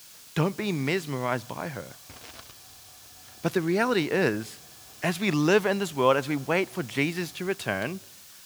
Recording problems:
hiss; noticeable; throughout; 20 dB below the speech

